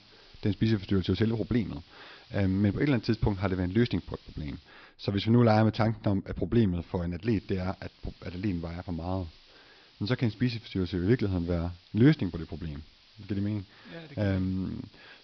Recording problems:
high frequencies cut off; noticeable; nothing above 5.5 kHz
hiss; faint; until 4.5 s and from 7.5 s on; 25 dB below the speech

